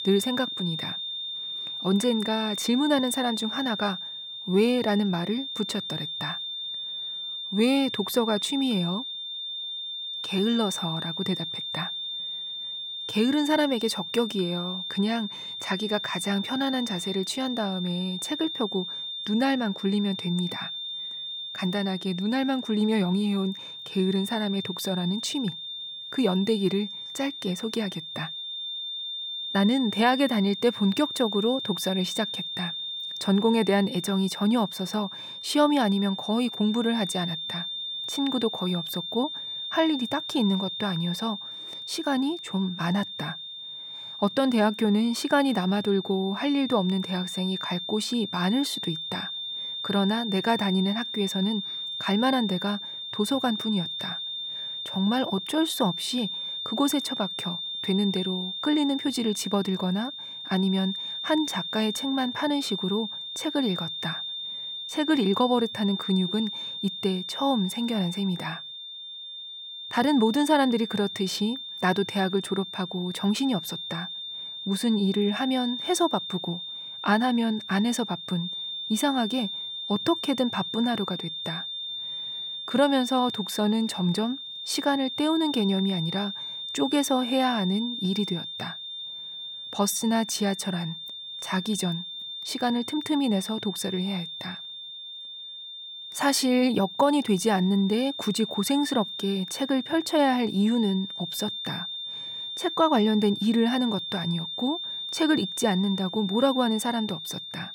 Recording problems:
high-pitched whine; loud; throughout; 3.5 kHz, 6 dB below the speech

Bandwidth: 17.5 kHz